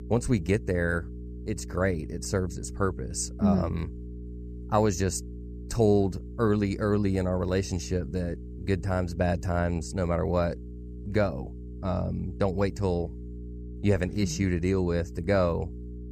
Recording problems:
electrical hum; noticeable; throughout; 60 Hz, 20 dB below the speech

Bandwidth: 14.5 kHz